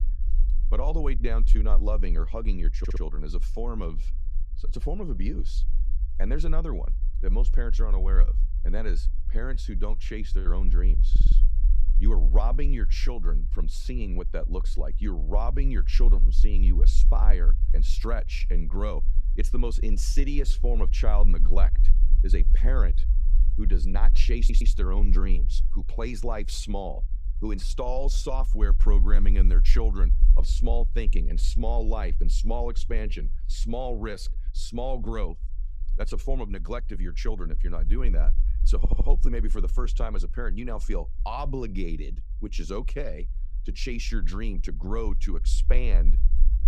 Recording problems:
low rumble; noticeable; throughout; 15 dB below the speech
audio stuttering; 4 times, first at 3 s

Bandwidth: 15.5 kHz